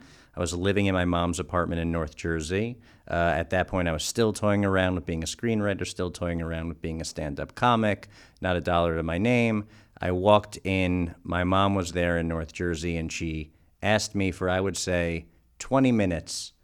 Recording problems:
none

